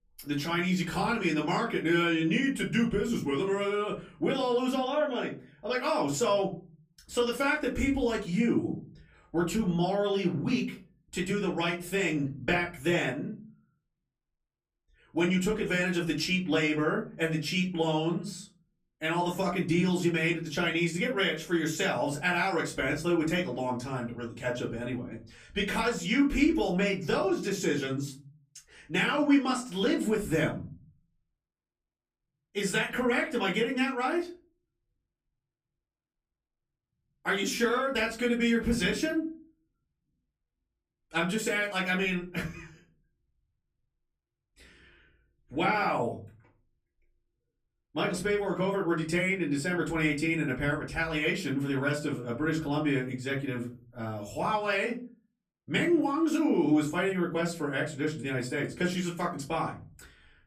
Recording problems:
off-mic speech; far
room echo; very slight; dies away in 0.5 s

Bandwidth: 15 kHz